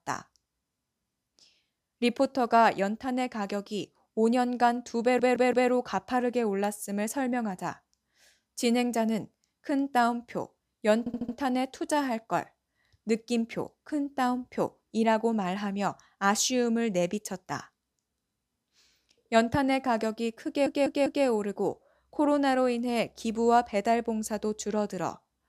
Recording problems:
audio stuttering; at 5 s, at 11 s and at 20 s

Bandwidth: 15 kHz